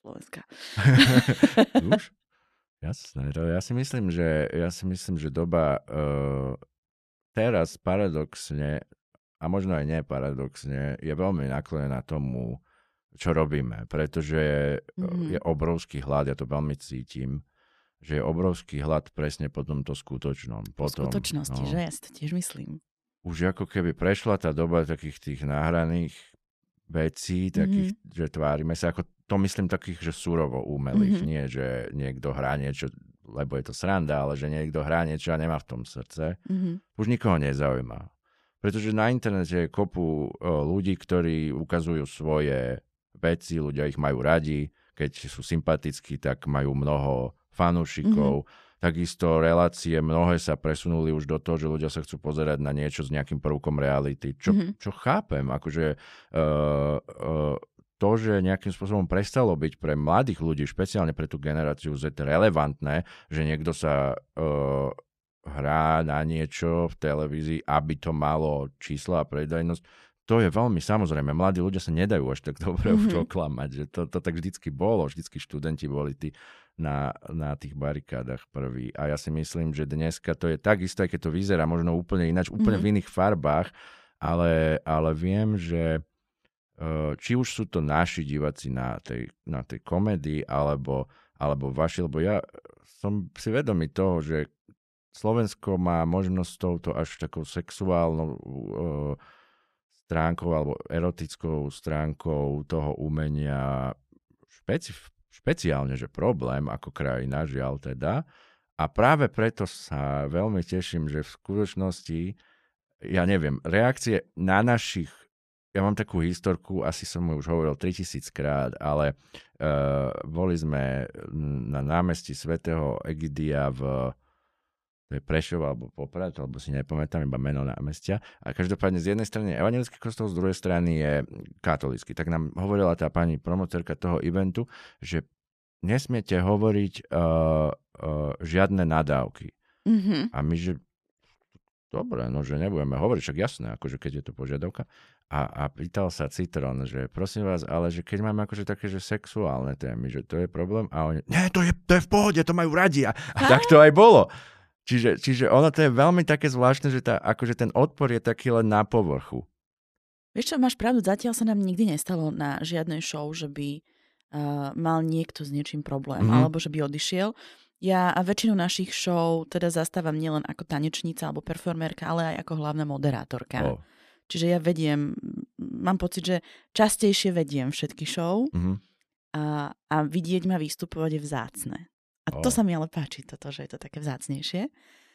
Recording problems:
none

